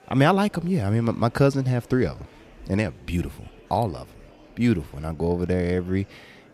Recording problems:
murmuring crowd; faint; throughout; 25 dB below the speech

